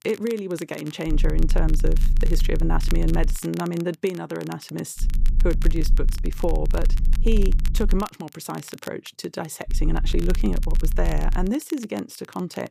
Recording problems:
low rumble; noticeable; from 1 to 3.5 s, from 5 to 8 s and from 9.5 to 11 s; 15 dB below the speech
crackle, like an old record; noticeable; 15 dB below the speech

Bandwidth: 14.5 kHz